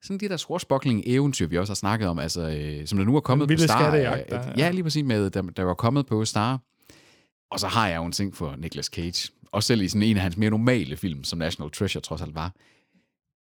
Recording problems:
none

